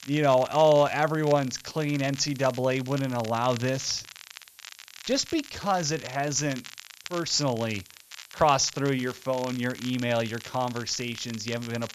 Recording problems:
high frequencies cut off; noticeable; nothing above 7.5 kHz
crackle, like an old record; noticeable; 15 dB below the speech
hiss; faint; throughout; 25 dB below the speech

